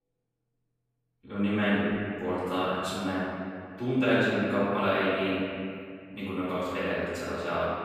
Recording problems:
room echo; strong; dies away in 2.2 s
off-mic speech; far

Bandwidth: 14.5 kHz